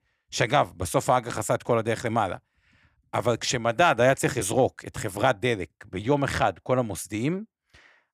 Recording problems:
none

